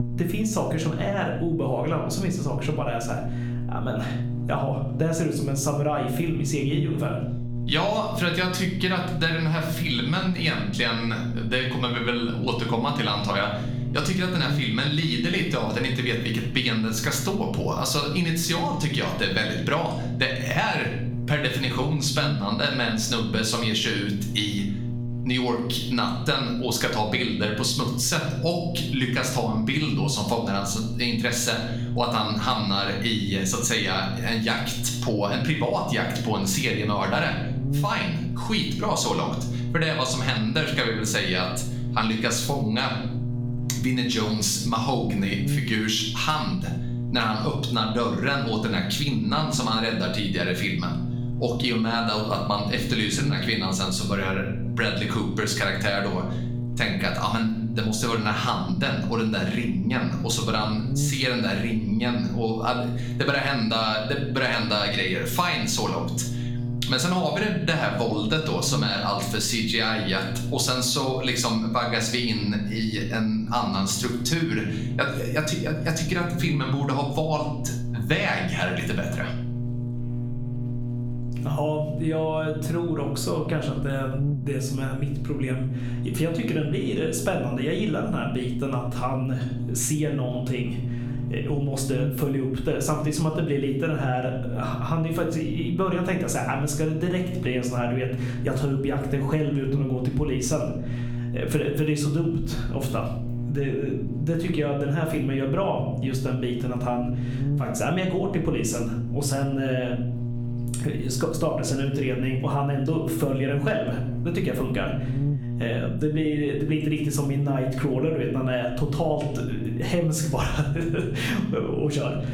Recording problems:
room echo; slight; dies away in 0.5 s
off-mic speech; somewhat distant
squashed, flat; somewhat
electrical hum; noticeable; throughout; 60 Hz, 15 dB below the speech

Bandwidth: 17.5 kHz